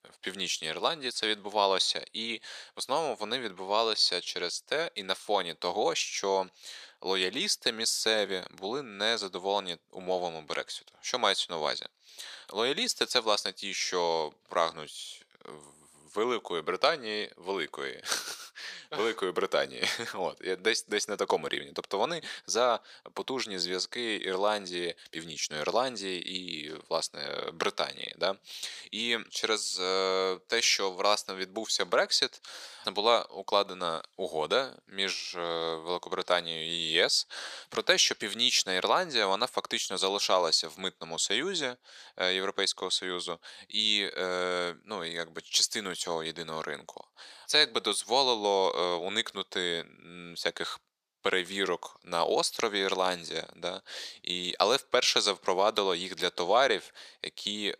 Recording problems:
thin; somewhat; fading below 400 Hz

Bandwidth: 14.5 kHz